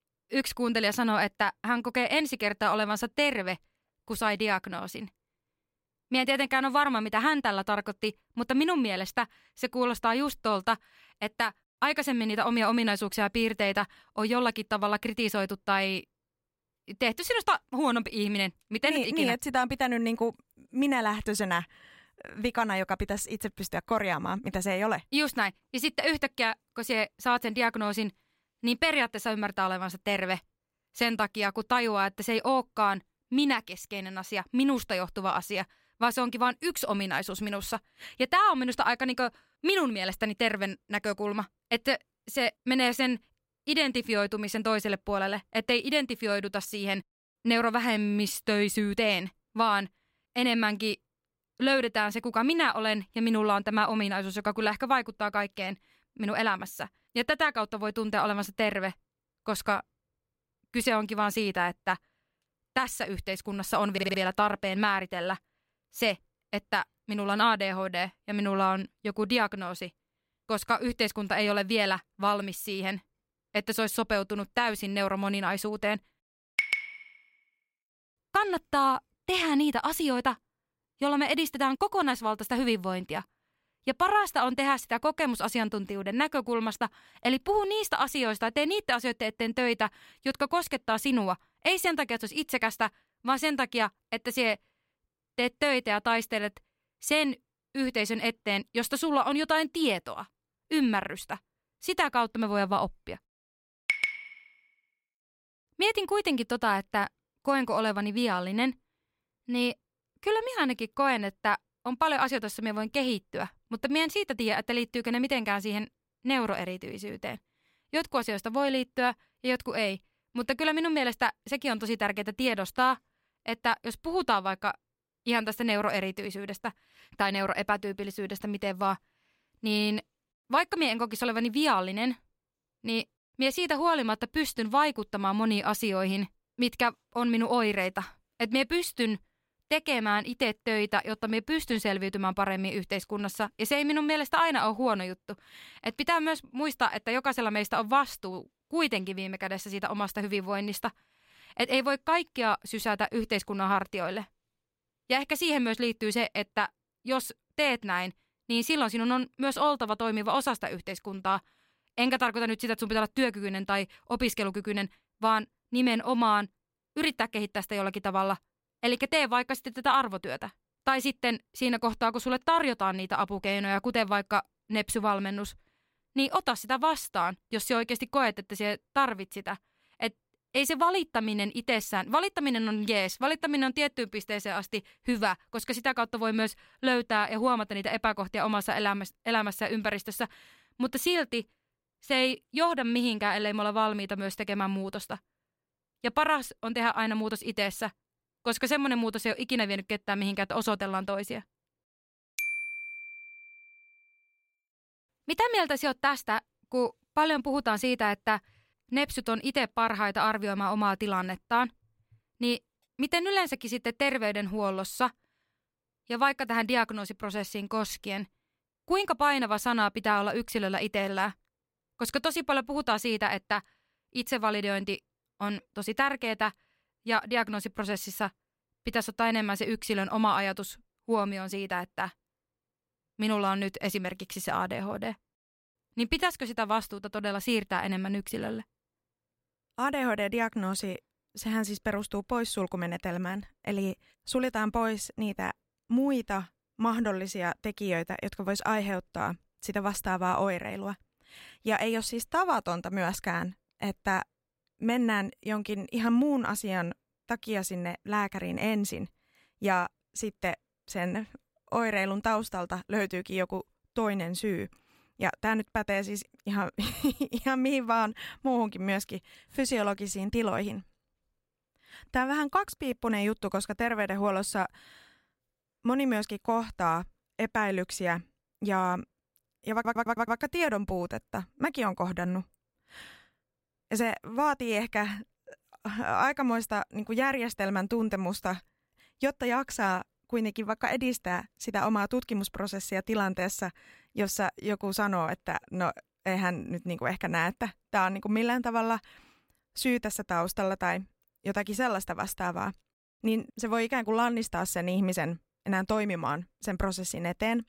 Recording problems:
audio stuttering; at 1:04 and at 4:40

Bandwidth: 16 kHz